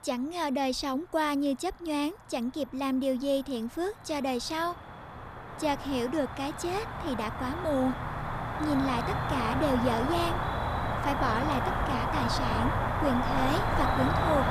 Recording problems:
animal sounds; very loud; throughout; as loud as the speech

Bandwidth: 14 kHz